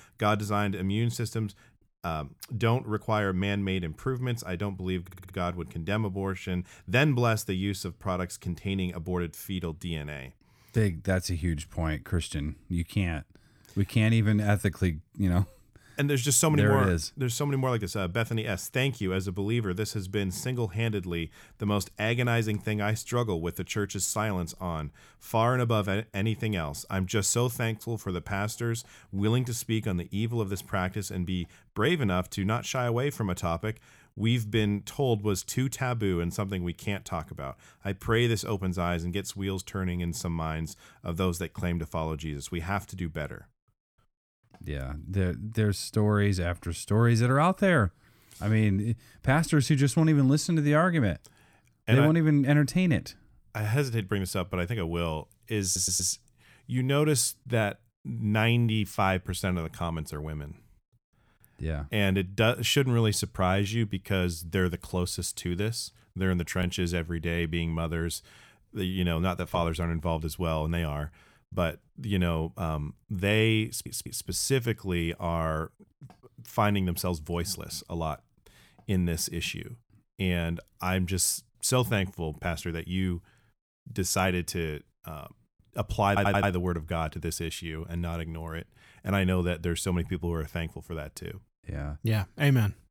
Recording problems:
audio stuttering; 4 times, first at 5 s

